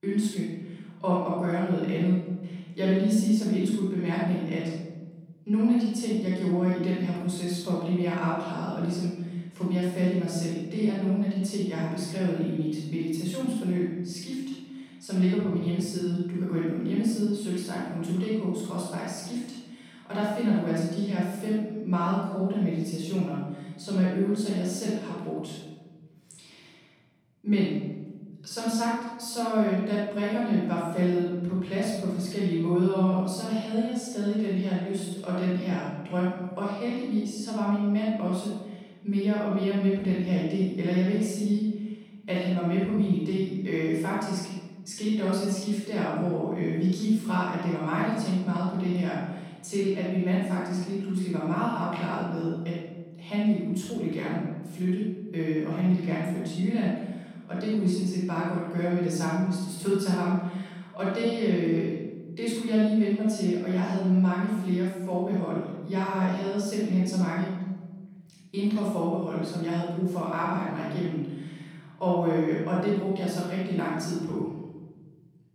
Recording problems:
room echo; strong; dies away in 1.4 s
off-mic speech; far

